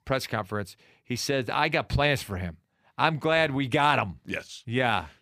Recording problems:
none

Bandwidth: 15 kHz